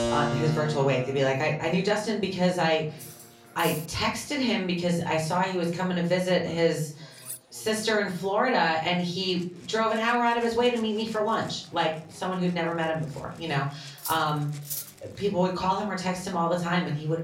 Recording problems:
off-mic speech; far
room echo; slight; dies away in 0.4 s
background music; noticeable; throughout; 15 dB below the speech
chatter from many people; faint; throughout; 30 dB below the speech
clattering dishes; faint; at 3 s and at 7 s; peak 10 dB below the speech
clattering dishes; noticeable; at 14 s; peak 7 dB below the speech

